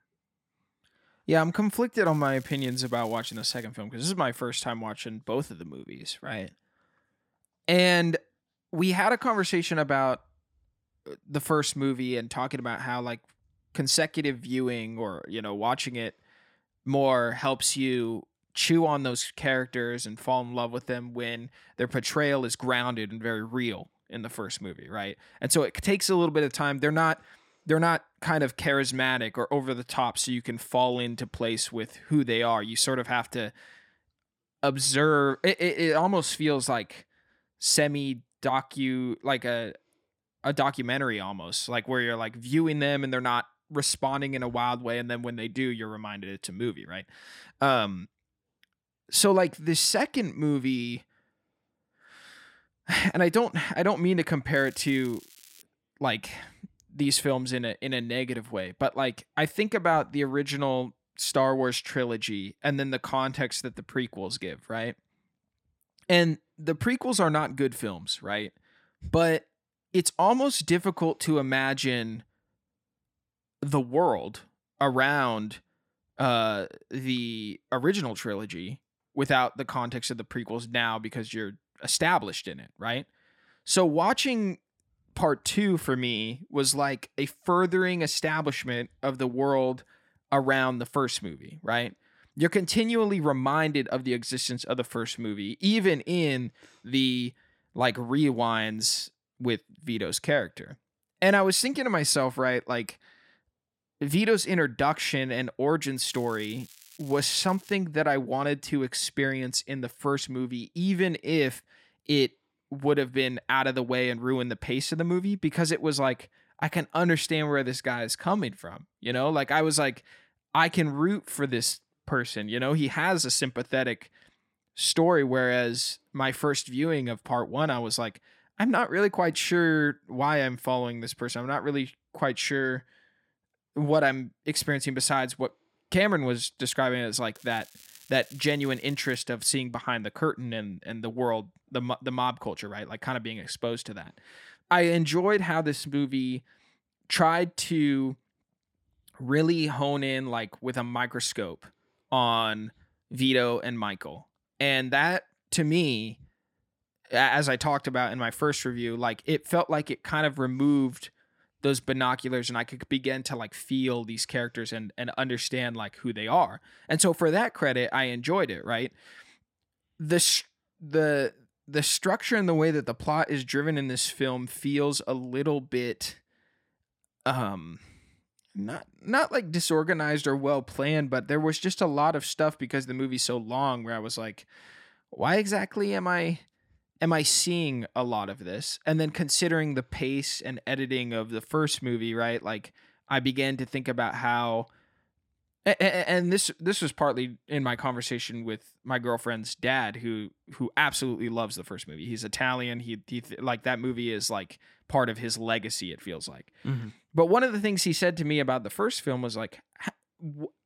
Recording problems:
crackling; faint; 4 times, first at 2 s; 25 dB below the speech

